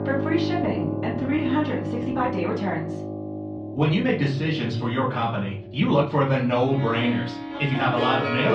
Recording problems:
off-mic speech; far
muffled; slightly; fading above 3.5 kHz
room echo; slight; dies away in 0.4 s
background music; loud; throughout; 7 dB below the speech
uneven, jittery; strongly; from 0.5 to 8 s
abrupt cut into speech; at the end

